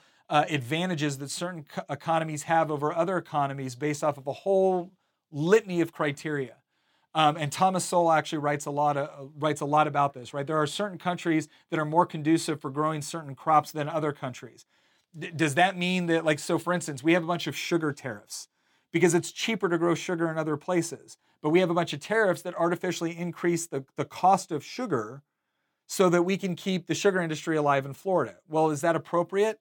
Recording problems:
none

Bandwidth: 17.5 kHz